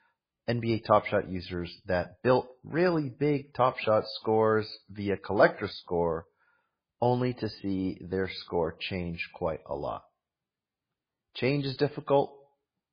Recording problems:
garbled, watery; badly; nothing above 4.5 kHz

